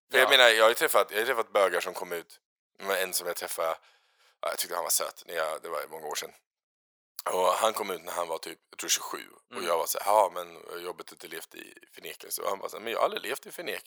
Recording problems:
thin; very; fading below 550 Hz

